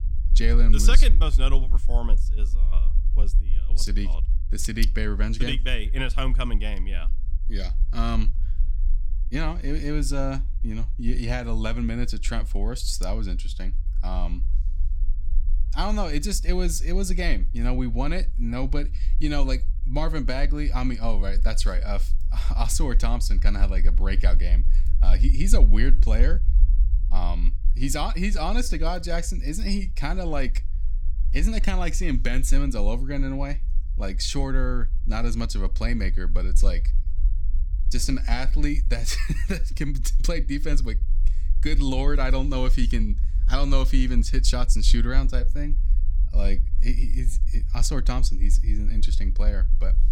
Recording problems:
low rumble; noticeable; throughout; 20 dB below the speech

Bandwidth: 18 kHz